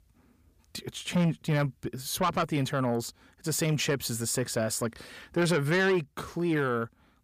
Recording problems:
distortion; slight; 10 dB below the speech

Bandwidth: 15 kHz